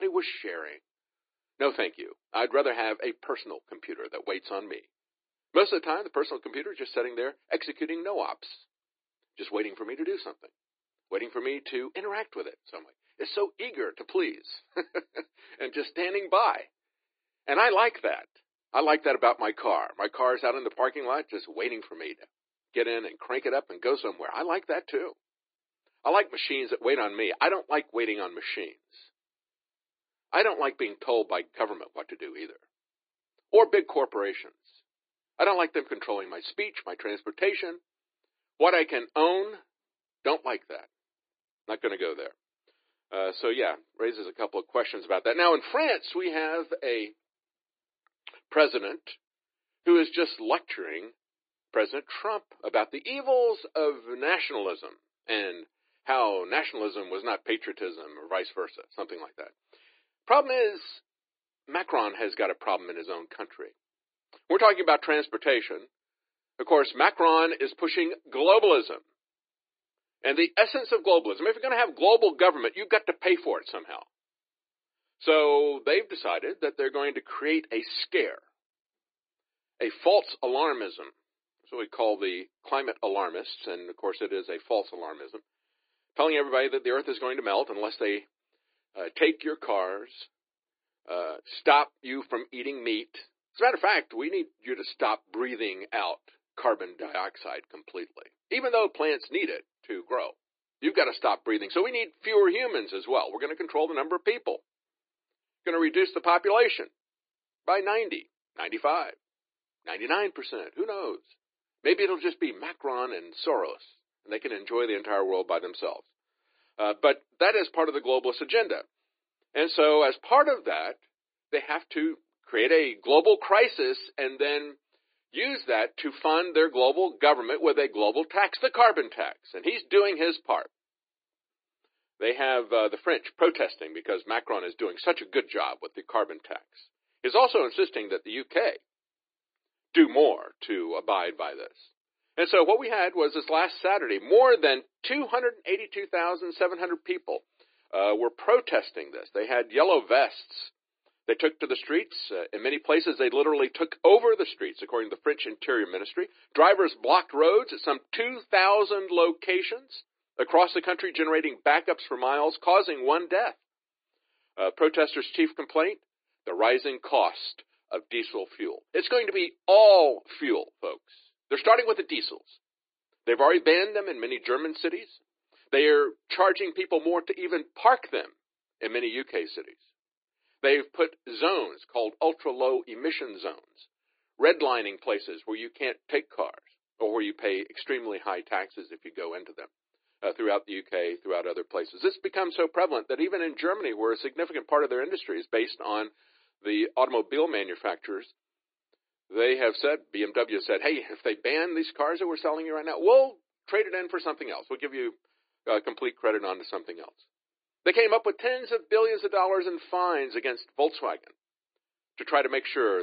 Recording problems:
thin; very; fading below 300 Hz
high frequencies cut off; severe; nothing above 4.5 kHz
garbled, watery; slightly
abrupt cut into speech; at the start and the end

